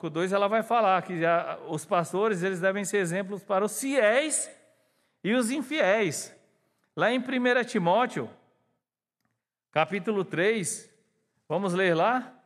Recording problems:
none

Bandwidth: 13.5 kHz